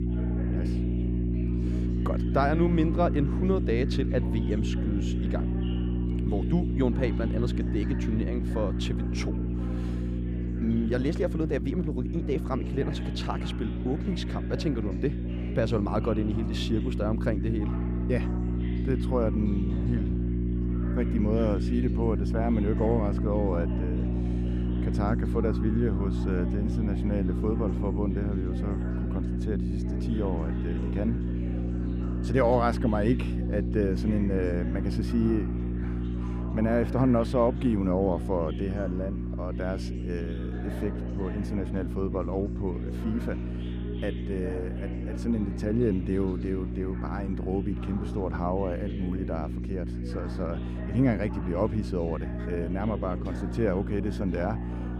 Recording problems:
electrical hum; loud; throughout; 60 Hz, 7 dB below the speech
chatter from many people; noticeable; throughout; 15 dB below the speech

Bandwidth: 14.5 kHz